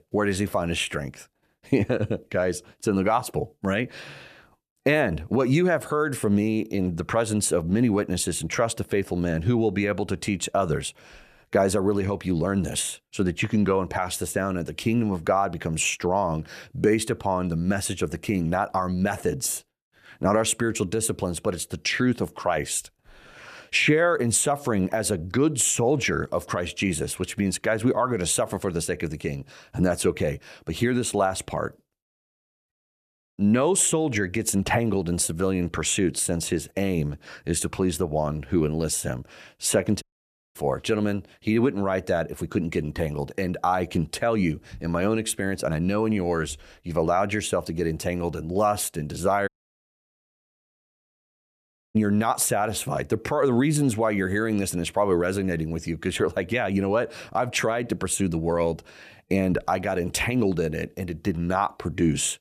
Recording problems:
audio cutting out; at 33 s for 0.5 s, at 40 s for 0.5 s and at 49 s for 2.5 s

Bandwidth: 14.5 kHz